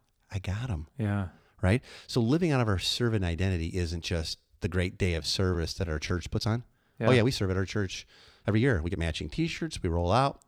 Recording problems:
uneven, jittery; strongly; from 1 to 9.5 s

